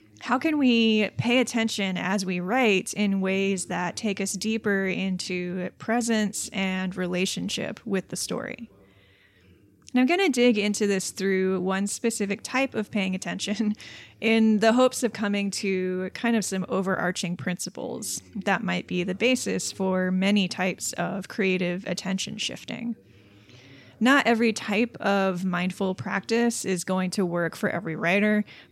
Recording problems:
voice in the background; faint; throughout; 30 dB below the speech

